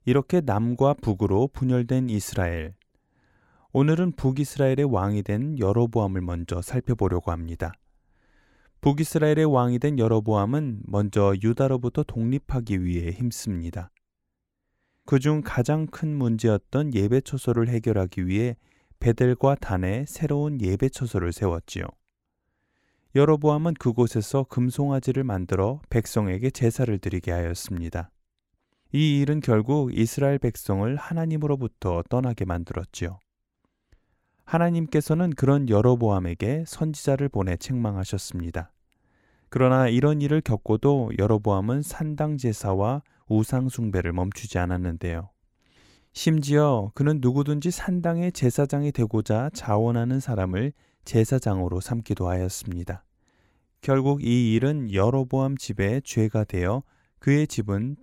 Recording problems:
none

